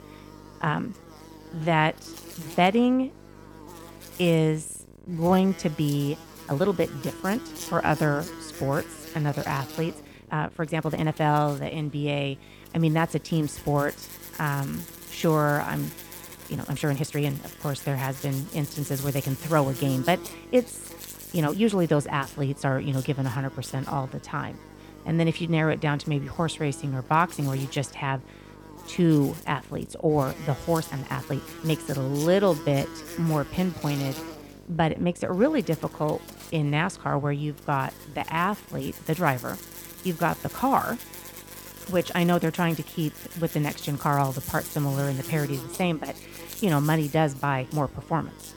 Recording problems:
electrical hum; noticeable; throughout; 50 Hz, 15 dB below the speech
uneven, jittery; strongly; from 0.5 to 48 s

